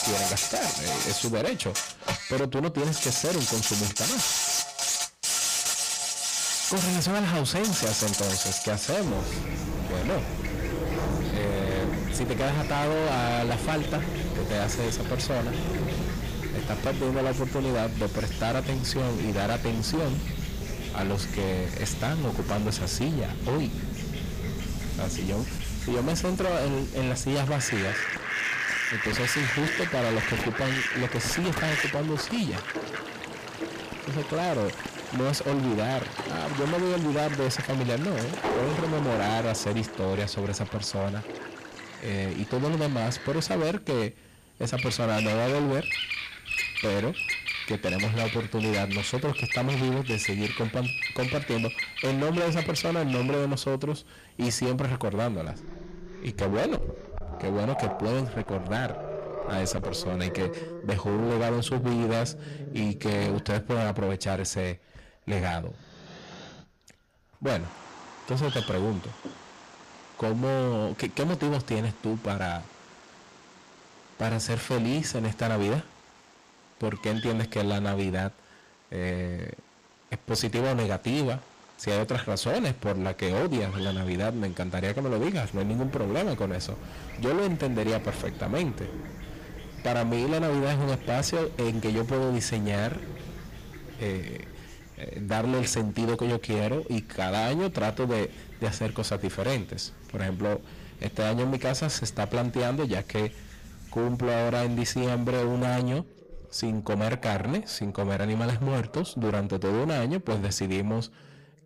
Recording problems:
distortion; heavy; 22% of the sound clipped
animal sounds; loud; throughout; 3 dB below the speech

